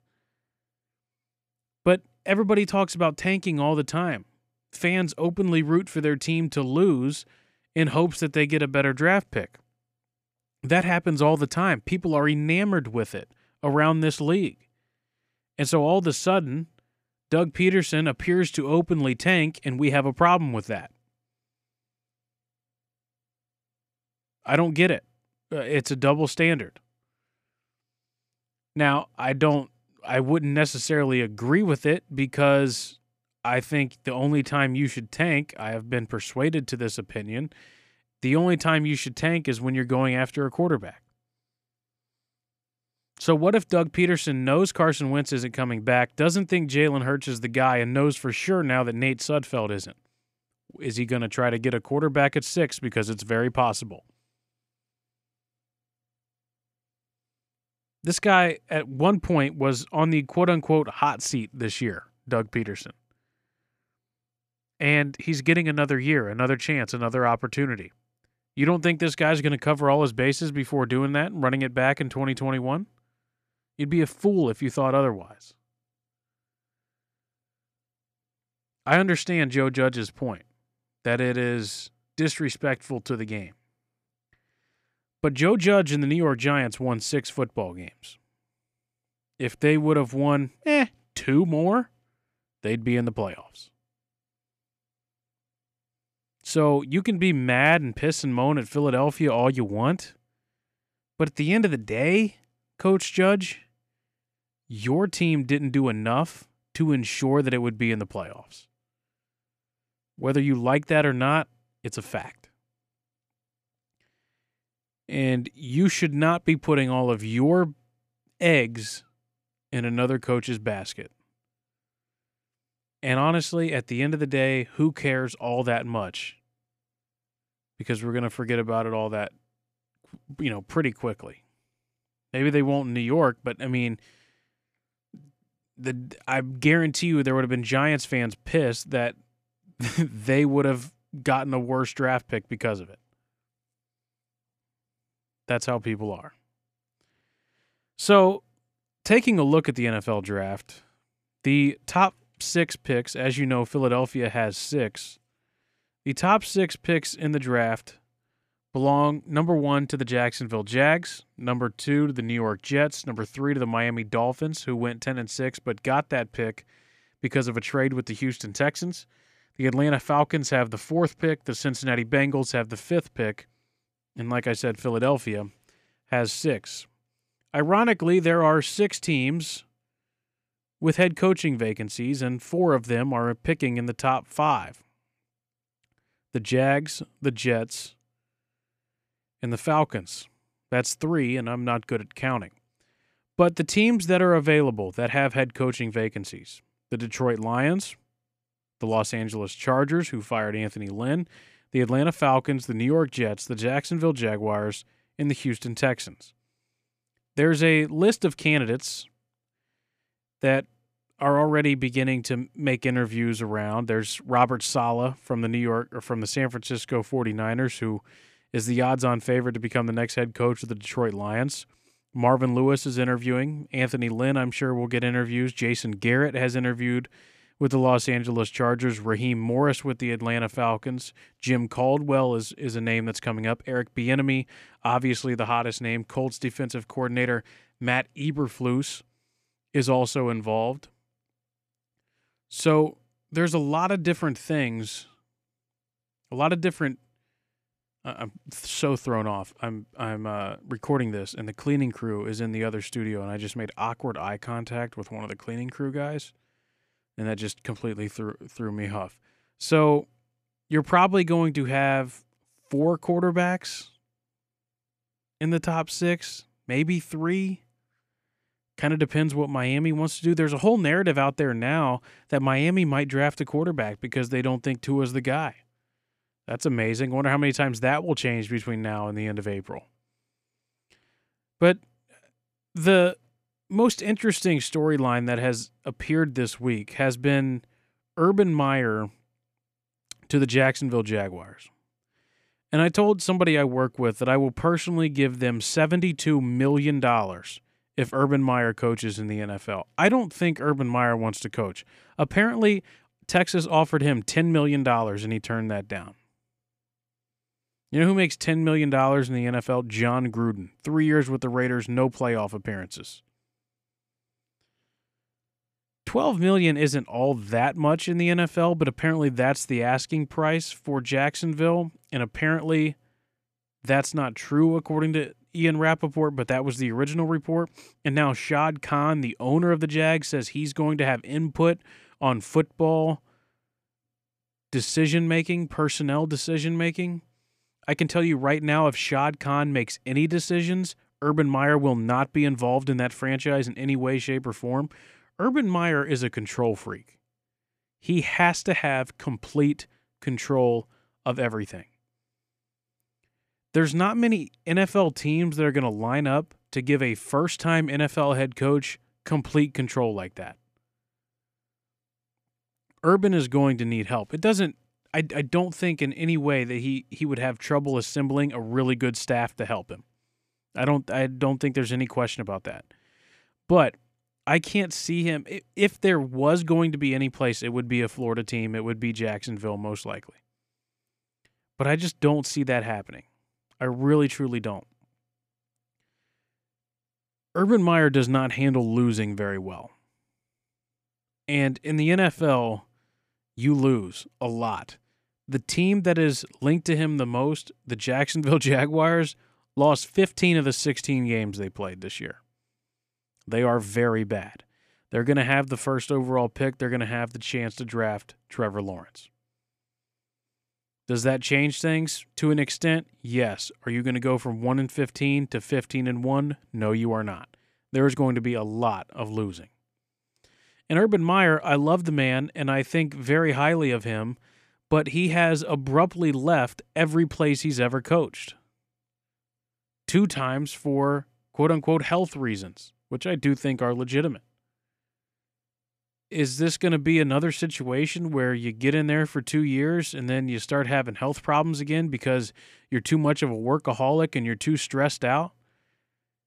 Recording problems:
none

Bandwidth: 14.5 kHz